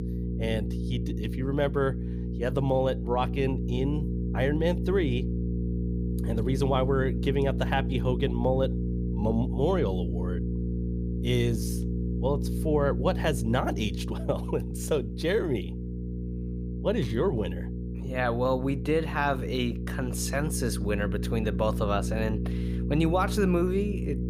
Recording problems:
electrical hum; noticeable; throughout; 60 Hz, 10 dB below the speech

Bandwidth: 15.5 kHz